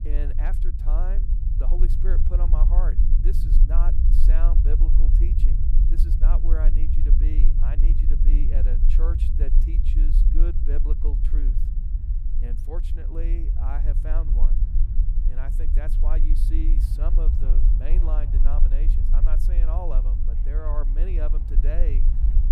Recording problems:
low rumble; loud; throughout; 4 dB below the speech
train or aircraft noise; faint; throughout; 20 dB below the speech

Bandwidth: 15 kHz